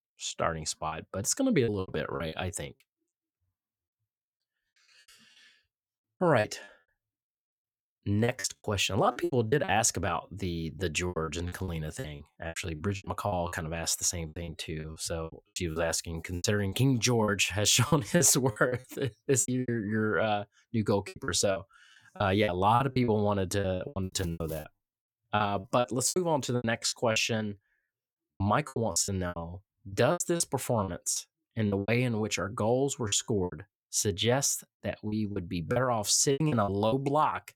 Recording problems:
choppy; very; 16% of the speech affected

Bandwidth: 17.5 kHz